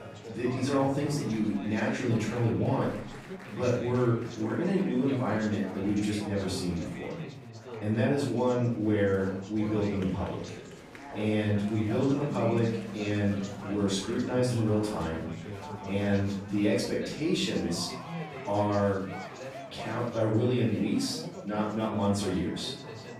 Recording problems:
off-mic speech; far
room echo; noticeable; dies away in 0.5 s
background music; noticeable; throughout; 20 dB below the speech
chatter from many people; noticeable; throughout; 10 dB below the speech

